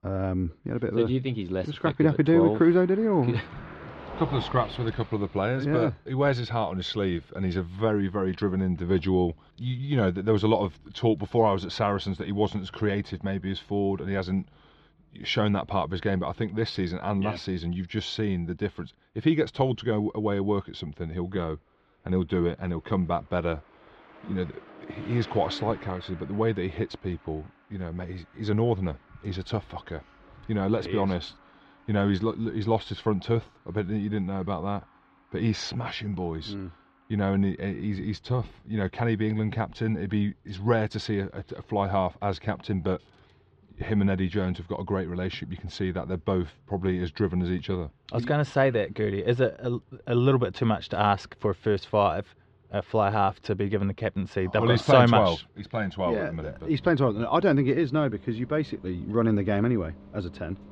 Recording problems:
muffled; slightly; fading above 3.5 kHz
traffic noise; faint; throughout; 25 dB below the speech

